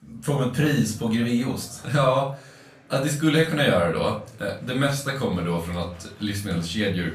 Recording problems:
off-mic speech; far
room echo; slight; dies away in 0.3 s
murmuring crowd; faint; throughout; 25 dB below the speech

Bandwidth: 14.5 kHz